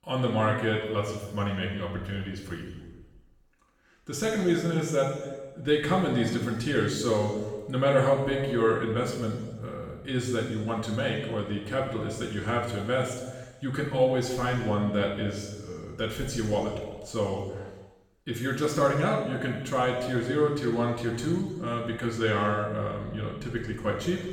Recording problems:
off-mic speech; far
room echo; noticeable; dies away in 1.2 s

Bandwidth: 17.5 kHz